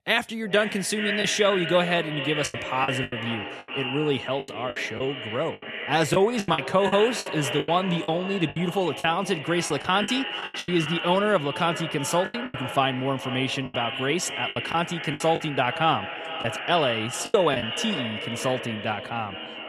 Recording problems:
echo of what is said; strong; throughout; 430 ms later, 6 dB below the speech
voice in the background; faint; throughout; 25 dB below the speech
choppy; very; 9% of the speech affected

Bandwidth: 13.5 kHz